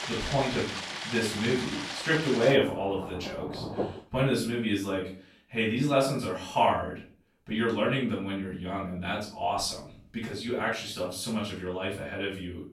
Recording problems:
off-mic speech; far
room echo; noticeable; dies away in 0.4 s
rain or running water; loud; until 4 s; 6 dB below the speech

